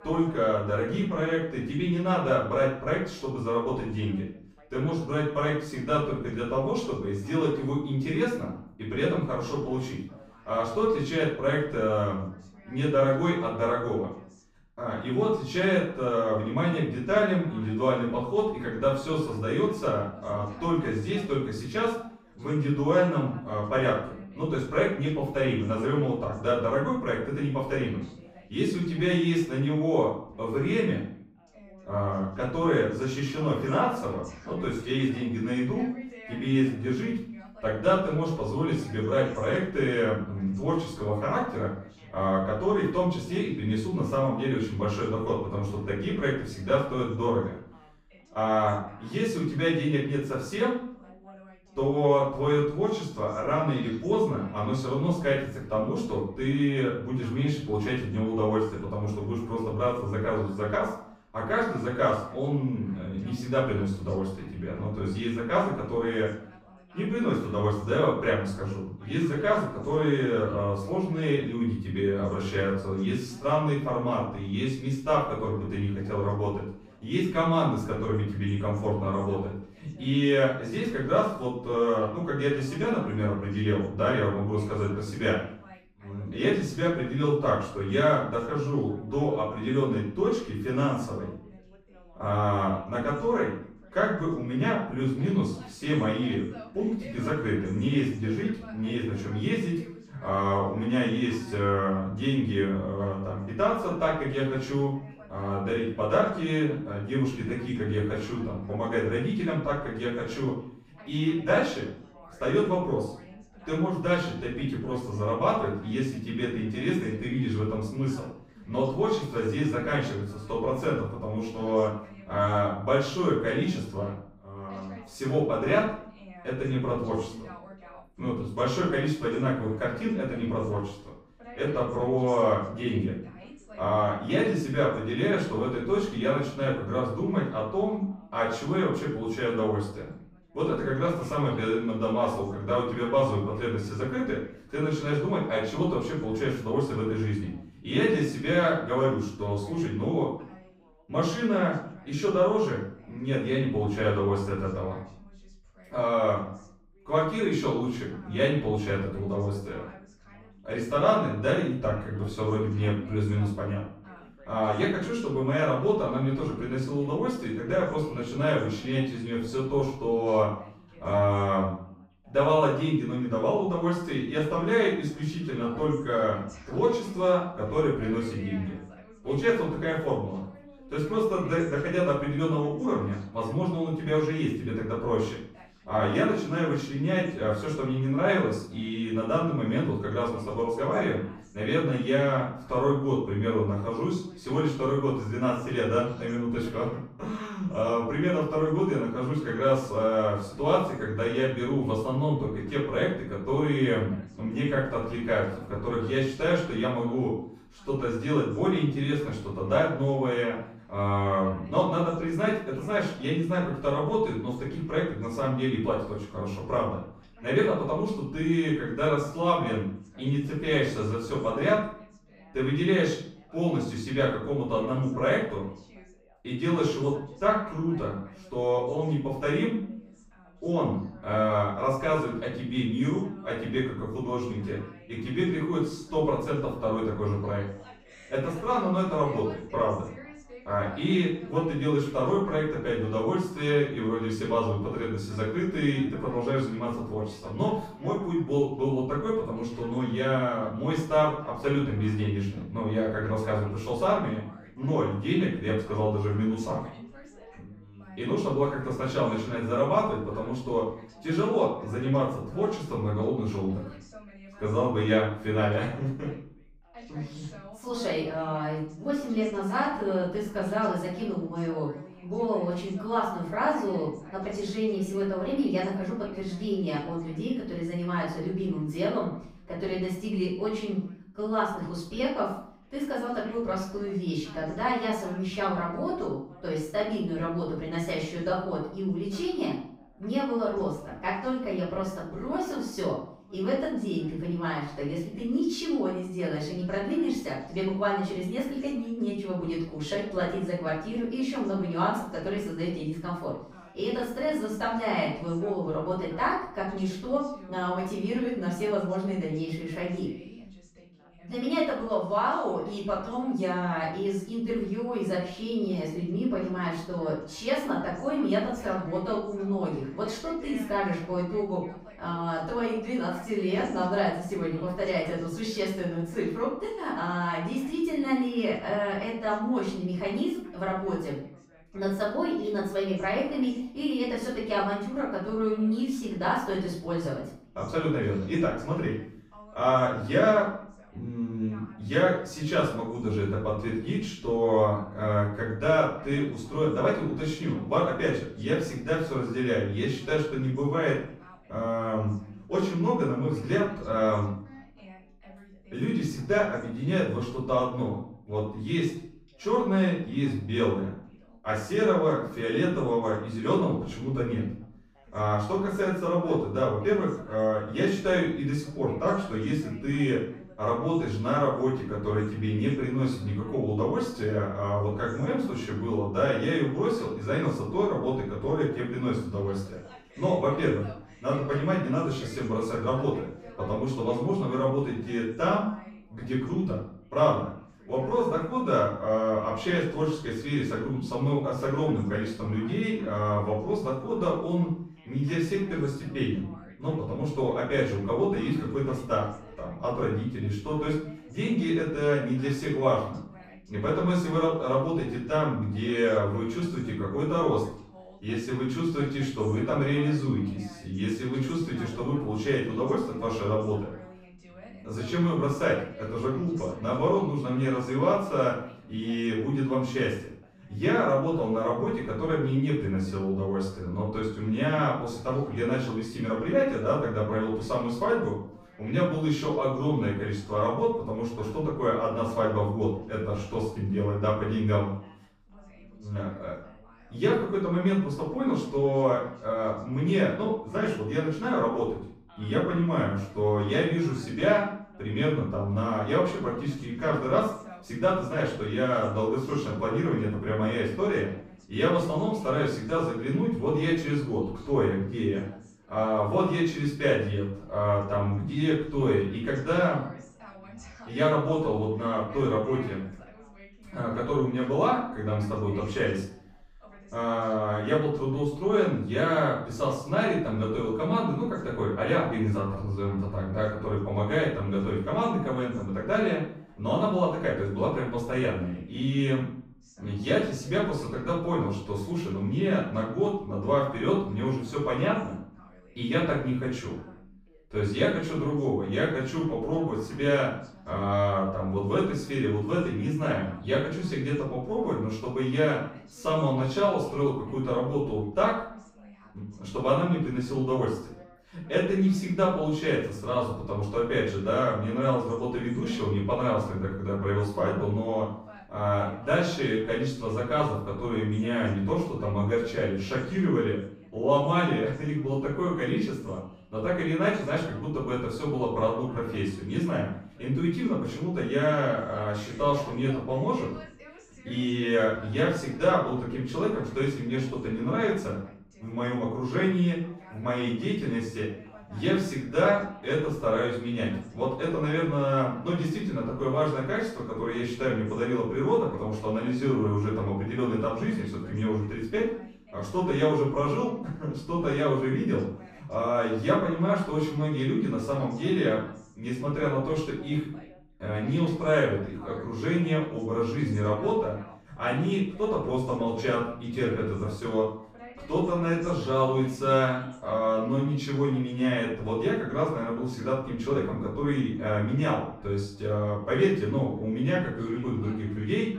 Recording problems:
off-mic speech; far
room echo; noticeable; dies away in 0.5 s
background chatter; faint; throughout; 2 voices, 25 dB below the speech

